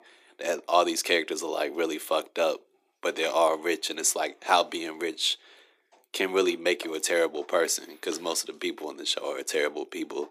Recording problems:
thin; very; fading below 300 Hz

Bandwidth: 15 kHz